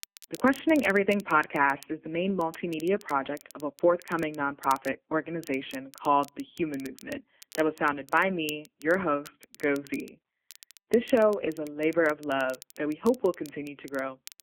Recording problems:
phone-call audio; poor line
crackle, like an old record; faint; 20 dB below the speech

